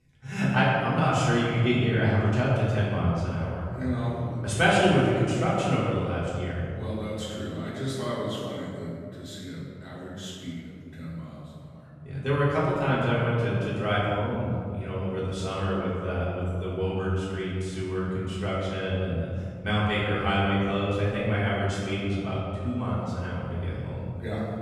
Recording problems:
room echo; strong; dies away in 2.6 s
off-mic speech; far

